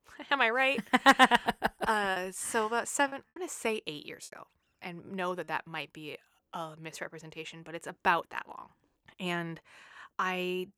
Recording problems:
choppy; very; from 2 to 4.5 s; 7% of the speech affected

